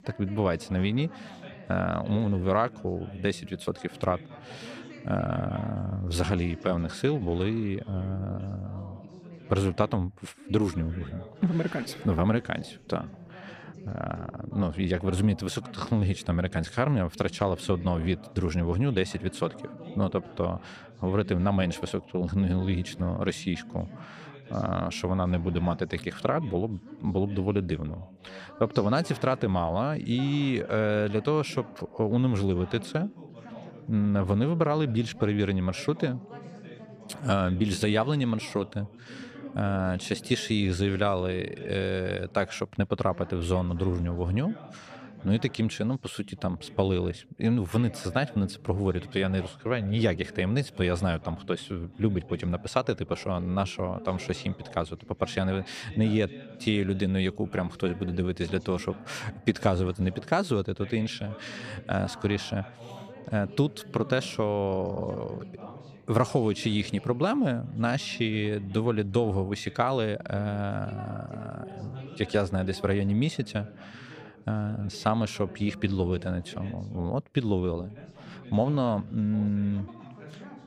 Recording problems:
background chatter; noticeable; throughout; 2 voices, 15 dB below the speech

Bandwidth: 14.5 kHz